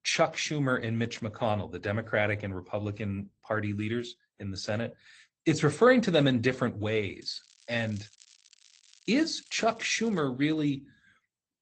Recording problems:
garbled, watery; slightly; nothing above 8 kHz
crackling; faint; from 7 to 10 s; 25 dB below the speech

